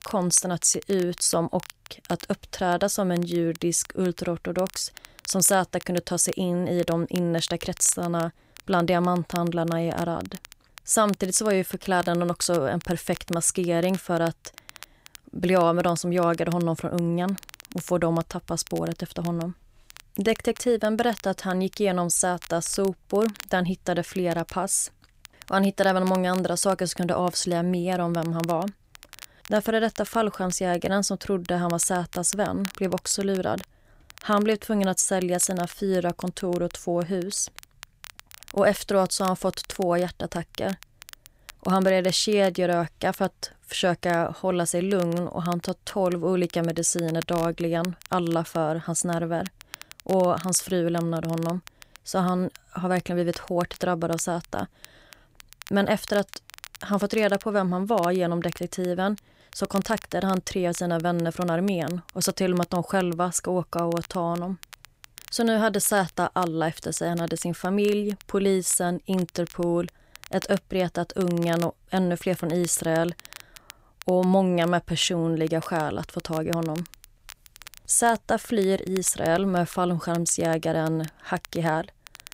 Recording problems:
crackle, like an old record; faint; 20 dB below the speech

